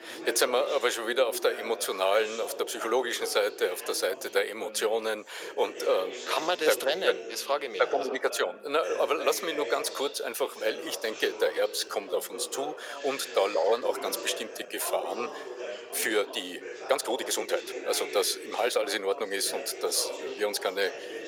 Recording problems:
thin; very; fading below 400 Hz
background chatter; noticeable; throughout; 3 voices, 10 dB below the speech
uneven, jittery; strongly; from 2.5 to 21 s

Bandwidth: 17 kHz